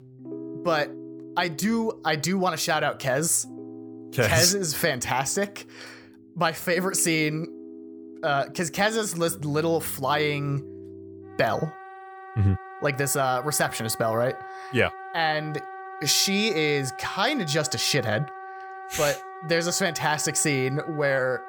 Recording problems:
background music; noticeable; throughout; 15 dB below the speech

